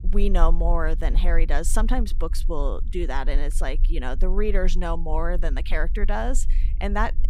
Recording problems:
low rumble; faint; throughout; 20 dB below the speech

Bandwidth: 15.5 kHz